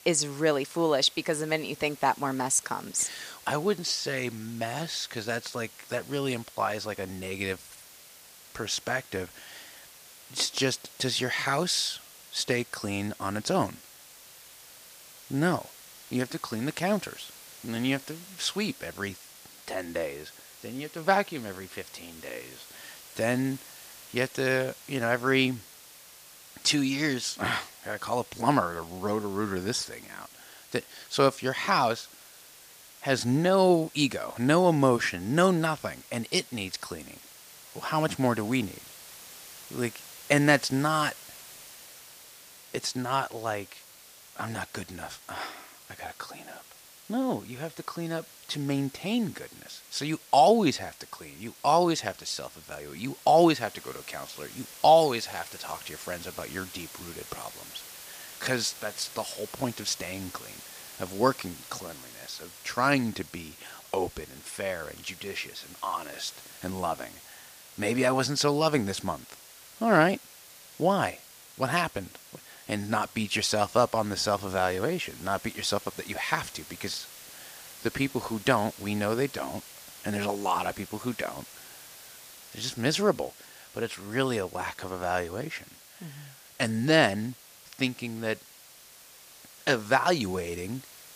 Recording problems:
hiss; noticeable; throughout; 20 dB below the speech

